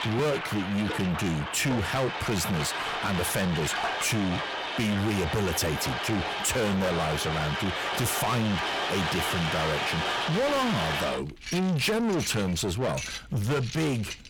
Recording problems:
distortion; heavy; 6 dB below the speech
household noises; loud; throughout; 3 dB below the speech

